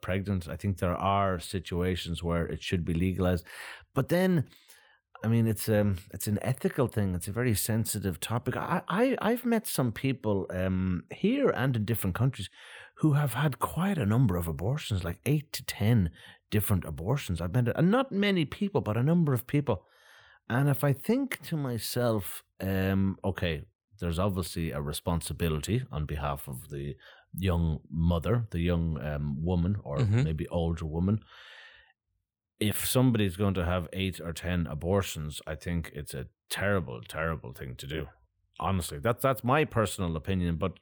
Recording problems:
none

